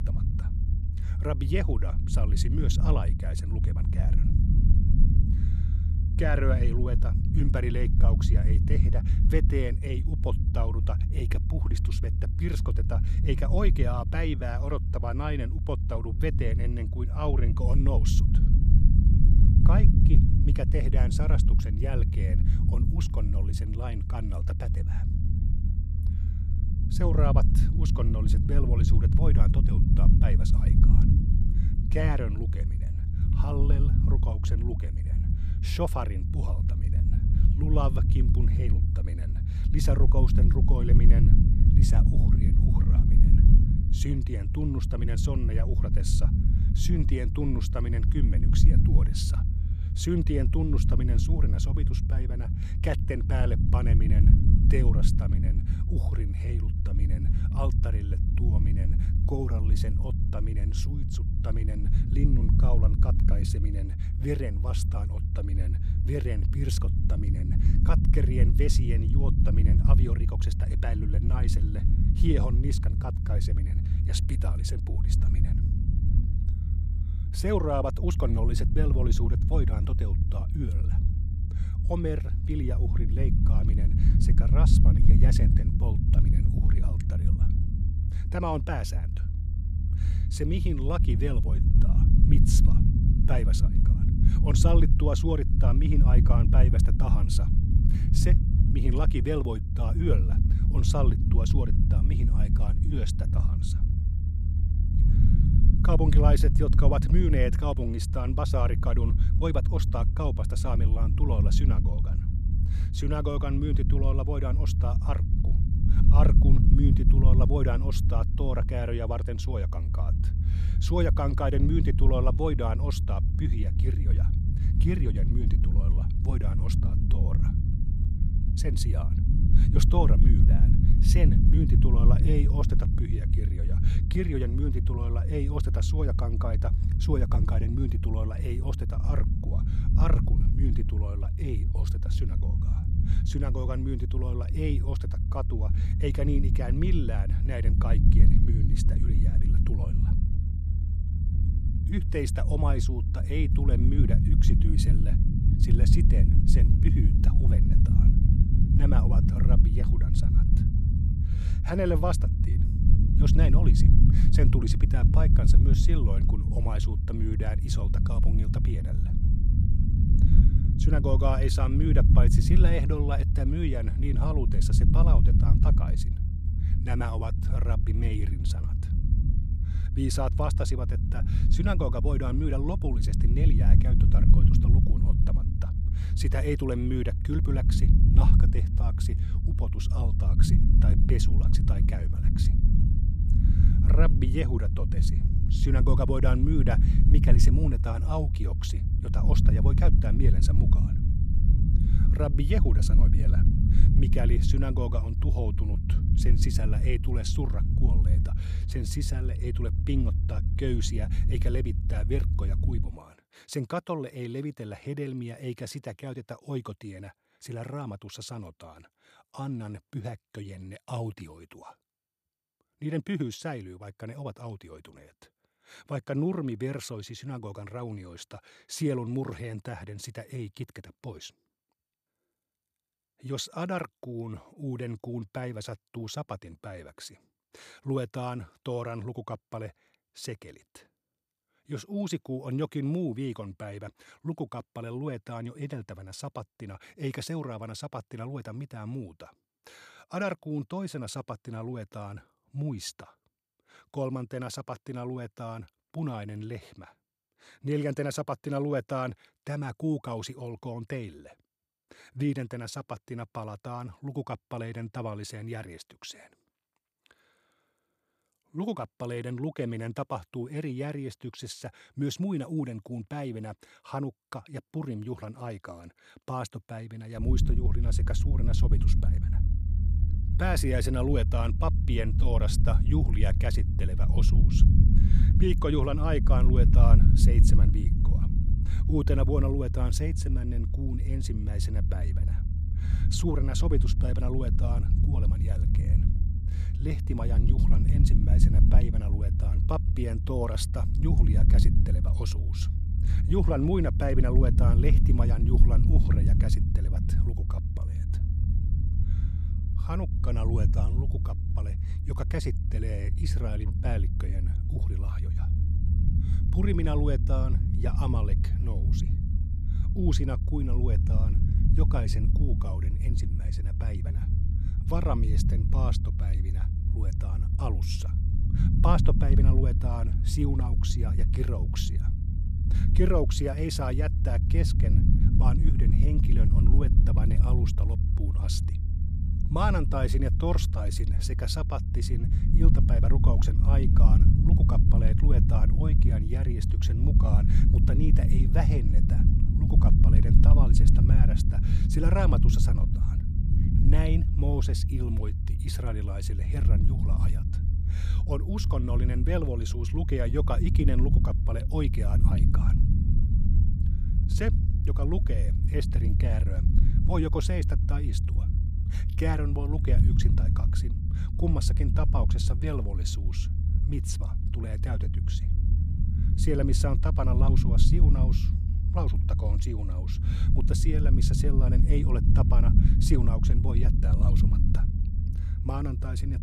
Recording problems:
low rumble; loud; until 3:33 and from 4:37 on; 4 dB below the speech

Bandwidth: 14 kHz